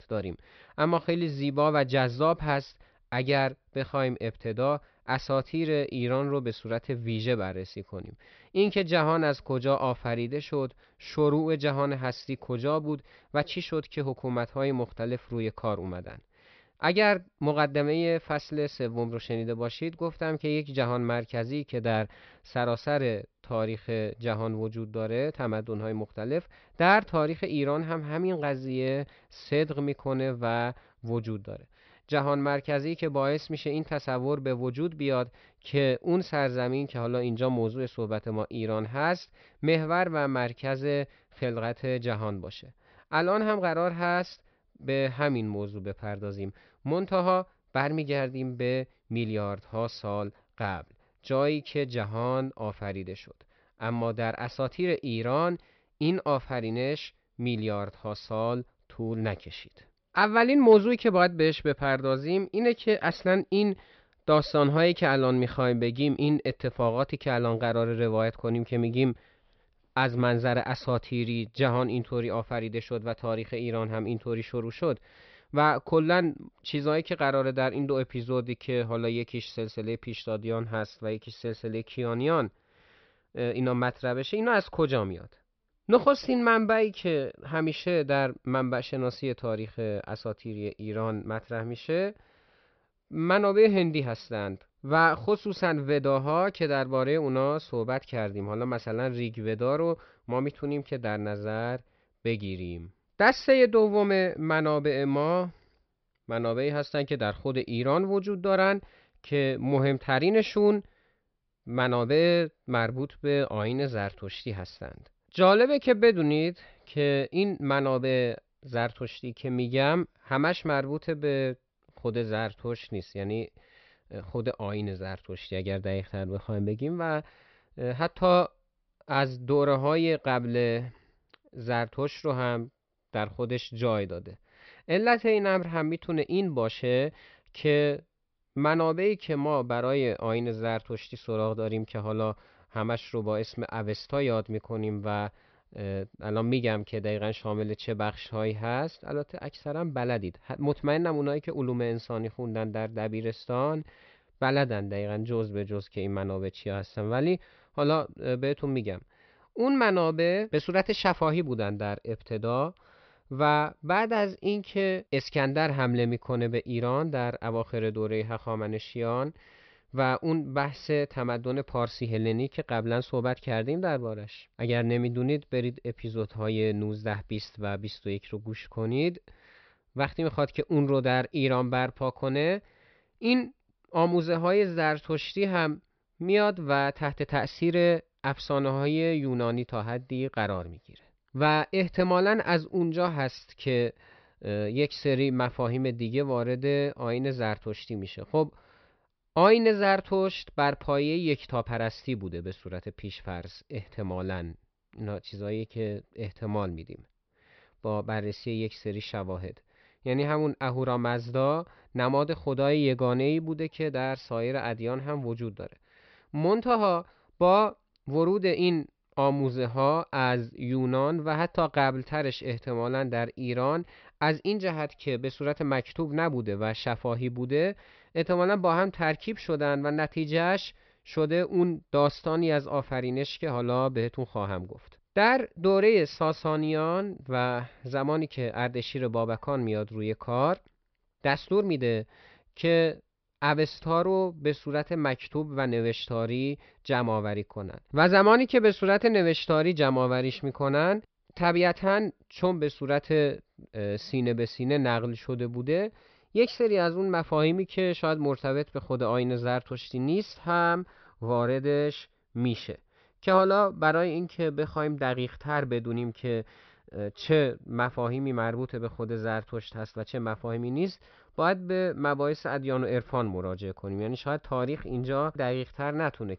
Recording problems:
high frequencies cut off; noticeable; nothing above 5.5 kHz

